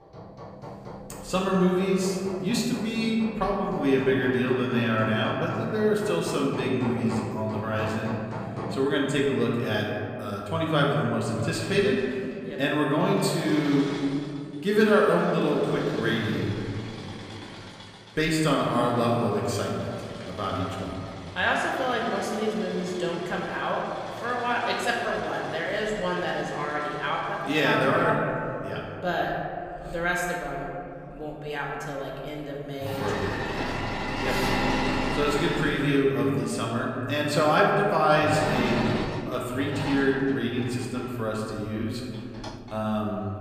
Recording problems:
room echo; noticeable; dies away in 2.5 s
off-mic speech; somewhat distant
machinery noise; loud; throughout; 9 dB below the speech

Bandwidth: 15 kHz